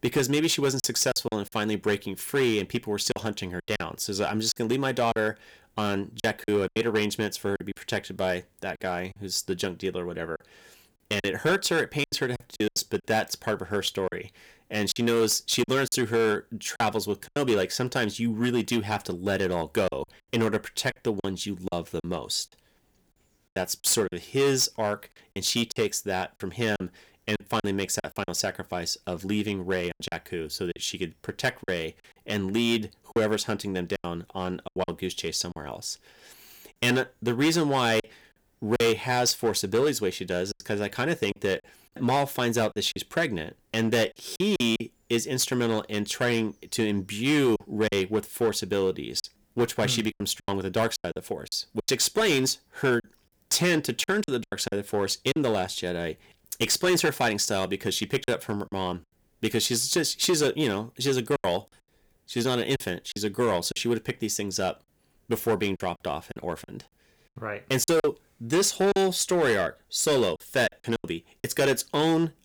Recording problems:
distortion; slight; 5% of the sound clipped
choppy; very; 8% of the speech affected

